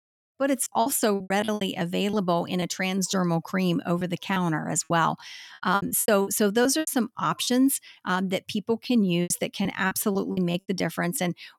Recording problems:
choppy; very; 11% of the speech affected

